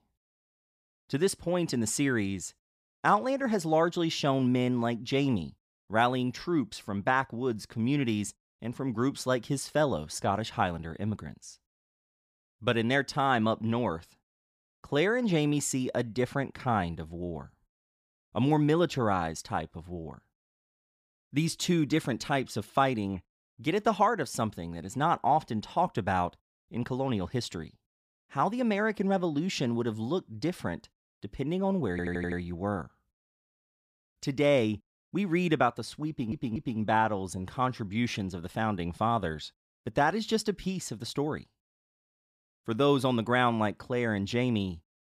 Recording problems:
audio stuttering; at 32 s and at 36 s

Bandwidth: 15 kHz